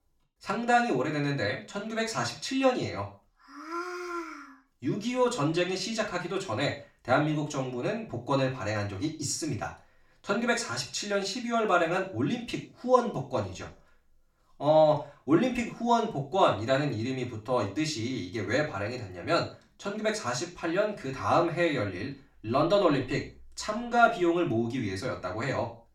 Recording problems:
off-mic speech; far
room echo; slight; dies away in 0.4 s

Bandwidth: 17 kHz